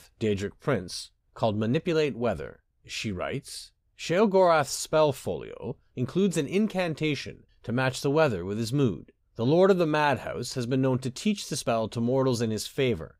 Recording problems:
none

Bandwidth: 15.5 kHz